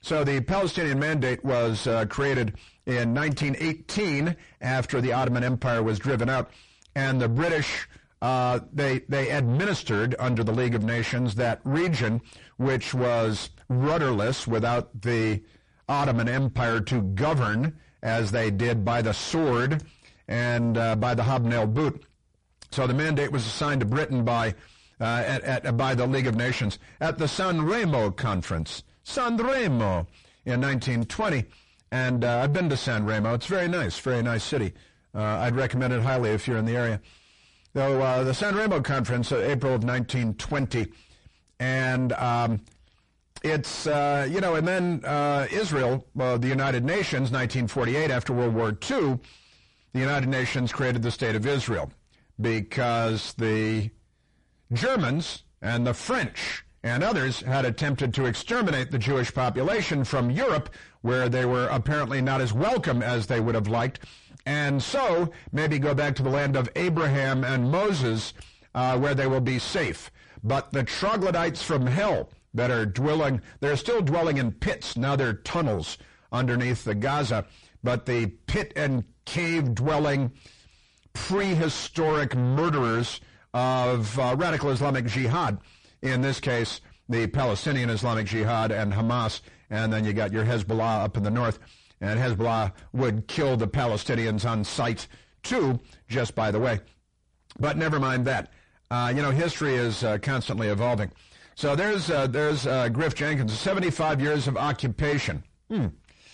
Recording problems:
distortion; heavy; 5 dB below the speech
garbled, watery; slightly; nothing above 9 kHz

